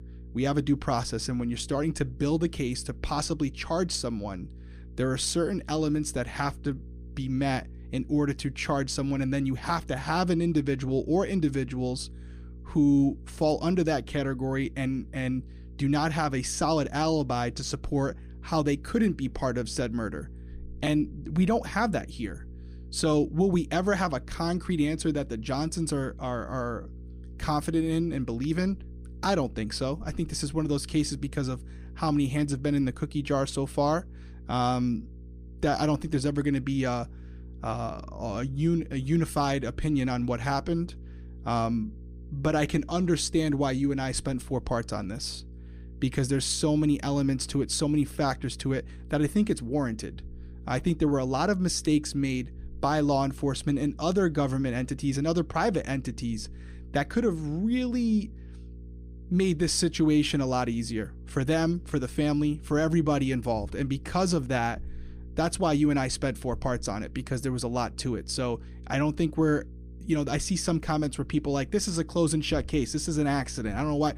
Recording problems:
electrical hum; faint; throughout; 60 Hz, 25 dB below the speech

